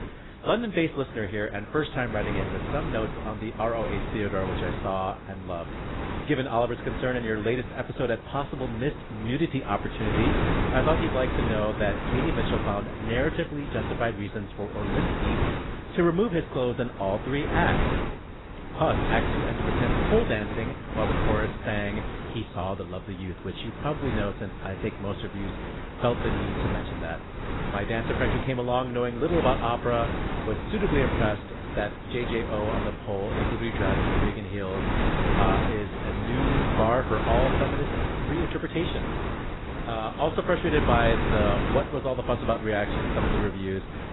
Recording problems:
garbled, watery; badly; nothing above 4 kHz
wind noise on the microphone; heavy; 3 dB below the speech

